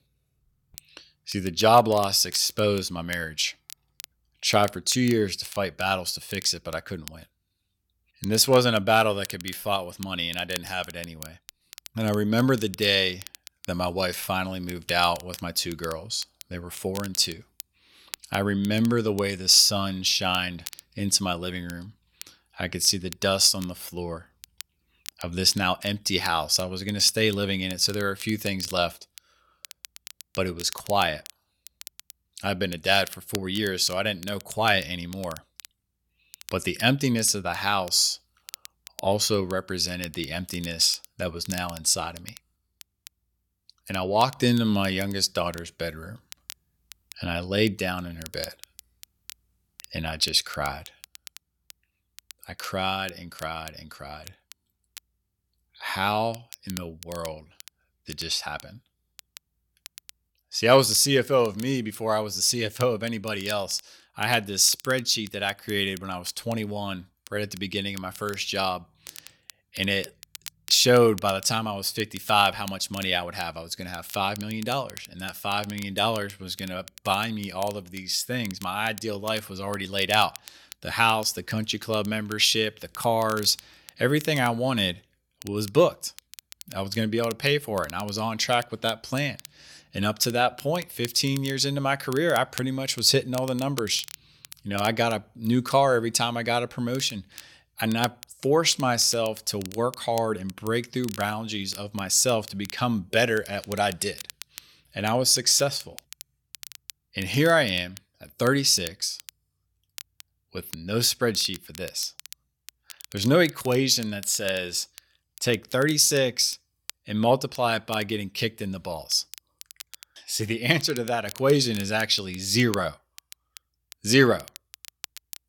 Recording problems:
crackle, like an old record; noticeable; 20 dB below the speech

